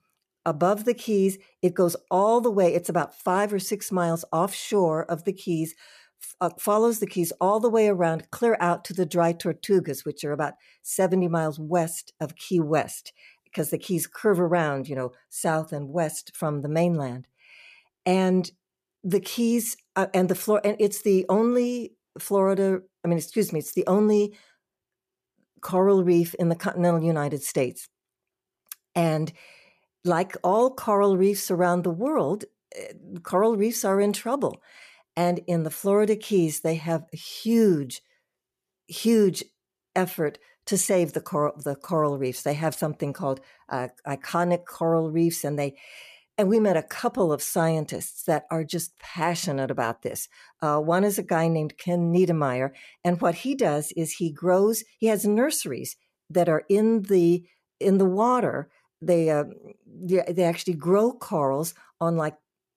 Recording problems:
none

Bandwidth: 14.5 kHz